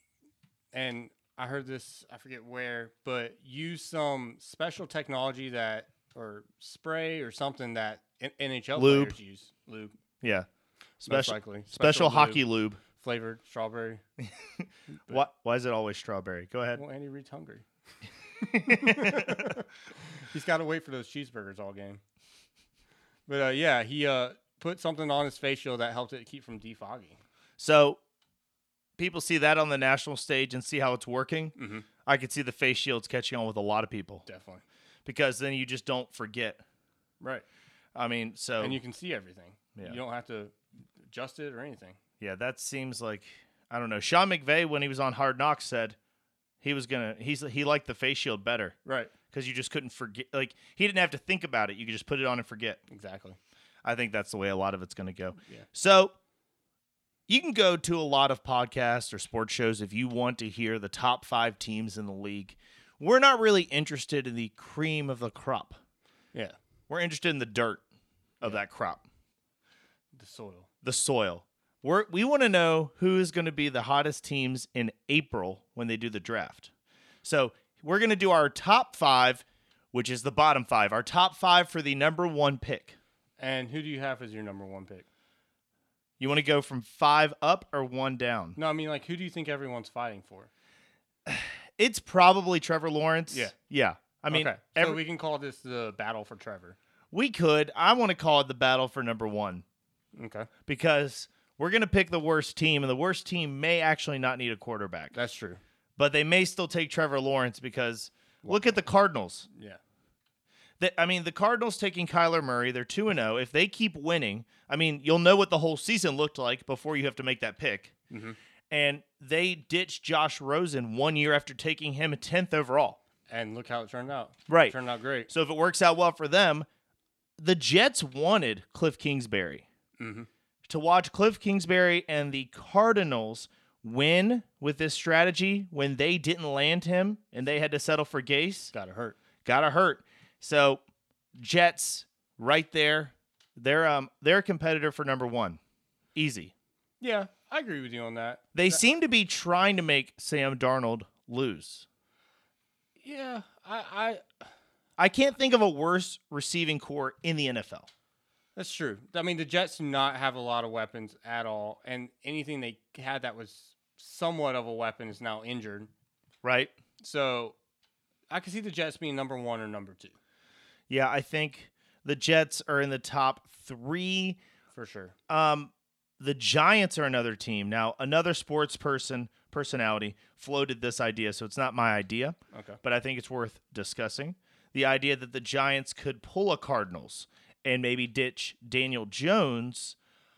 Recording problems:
none

